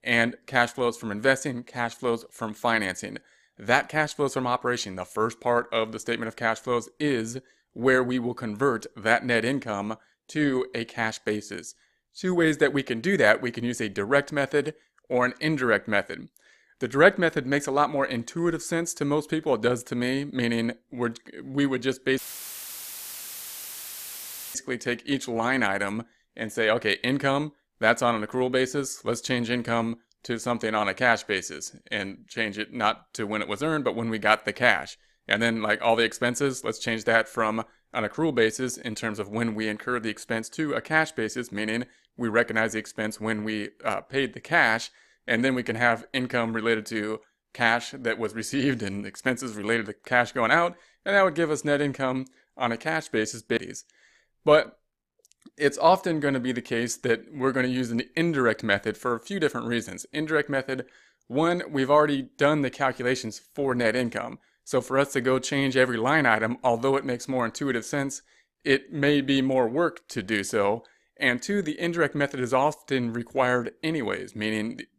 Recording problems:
audio cutting out; filled with static; at 22 s for 2.5 s

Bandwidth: 14.5 kHz